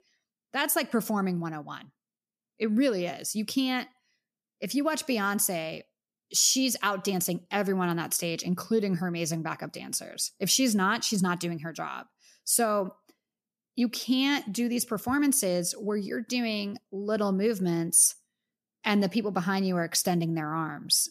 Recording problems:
none

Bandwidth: 14.5 kHz